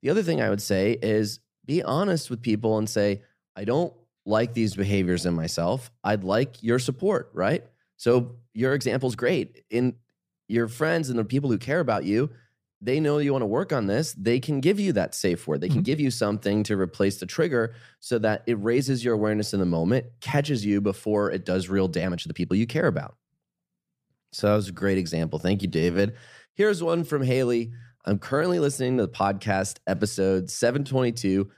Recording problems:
uneven, jittery; strongly; from 1.5 to 31 s

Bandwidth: 15 kHz